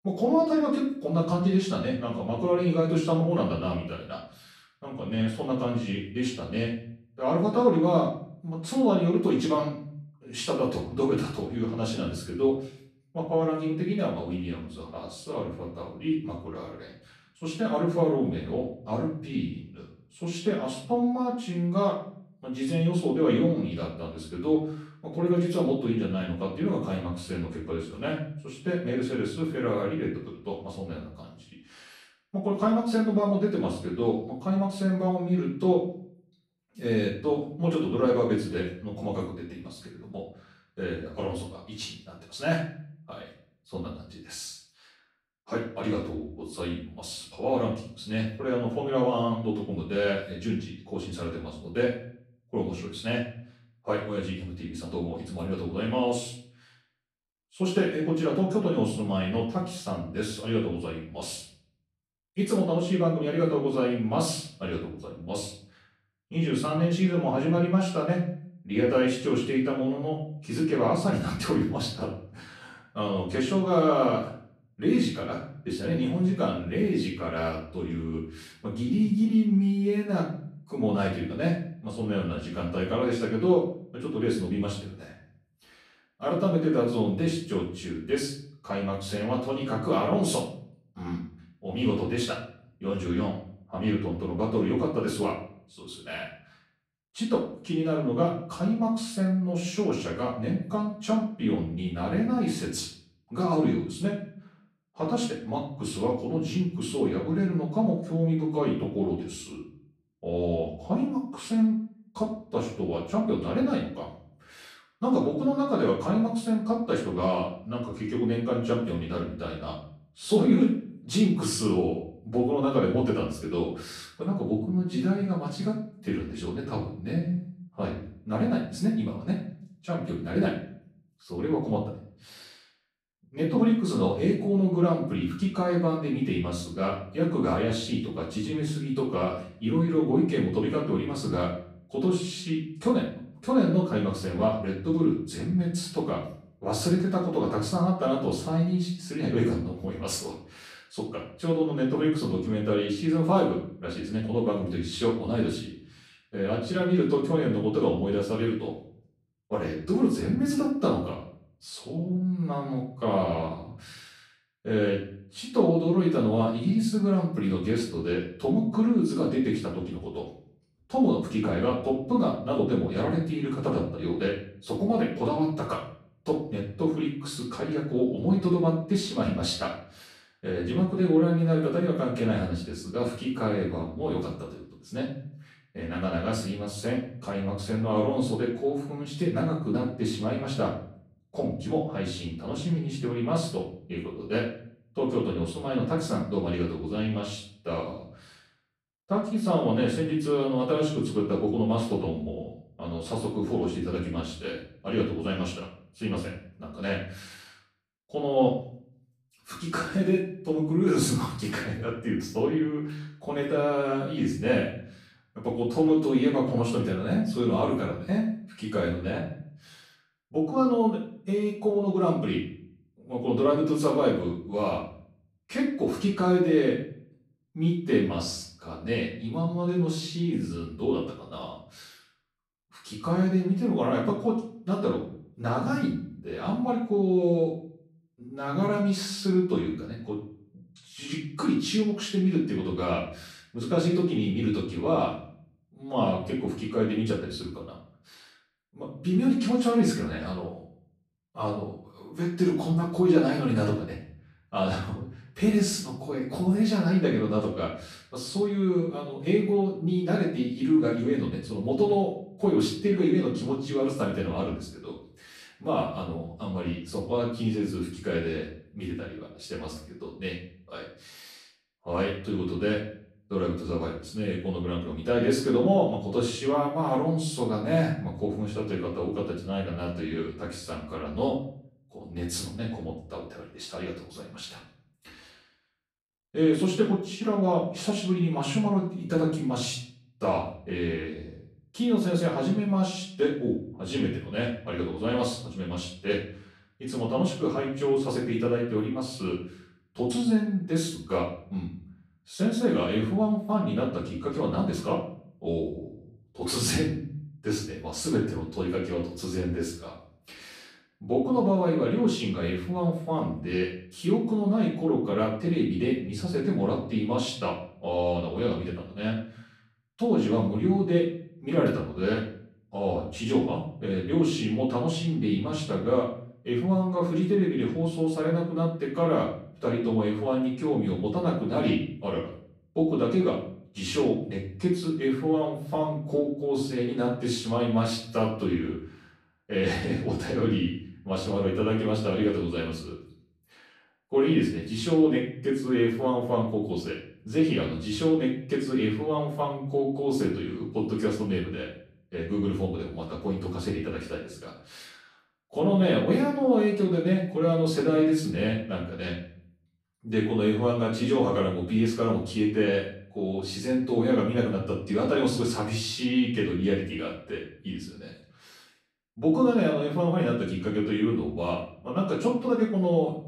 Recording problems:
off-mic speech; far
room echo; noticeable; dies away in 0.5 s

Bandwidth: 14.5 kHz